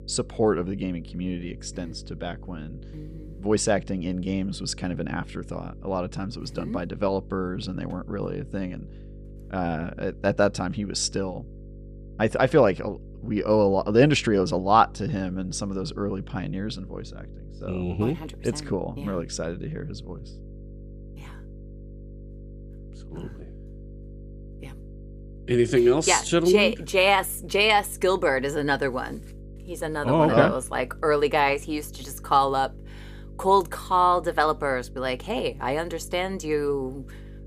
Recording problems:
electrical hum; faint; throughout; 50 Hz, 30 dB below the speech

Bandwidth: 14.5 kHz